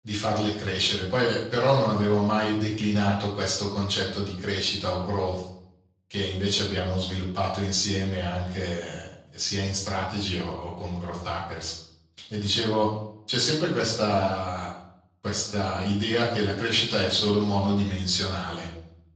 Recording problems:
off-mic speech; far
room echo; noticeable; dies away in 0.6 s
thin; somewhat; fading below 800 Hz
garbled, watery; slightly; nothing above 7.5 kHz

